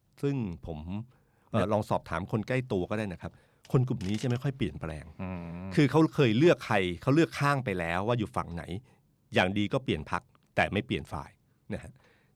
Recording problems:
none

